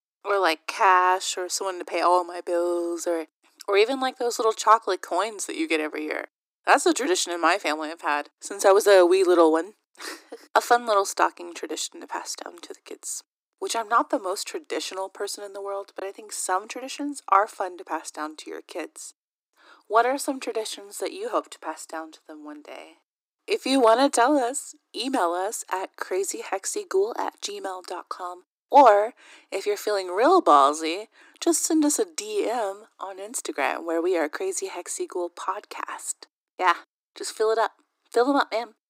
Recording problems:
thin; somewhat; fading below 300 Hz

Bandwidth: 15.5 kHz